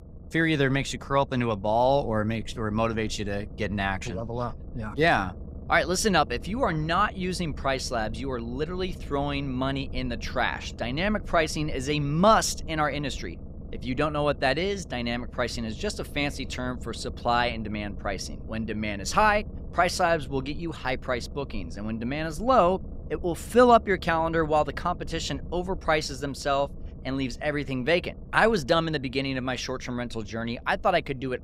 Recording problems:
low rumble; faint; throughout; 25 dB below the speech

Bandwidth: 15.5 kHz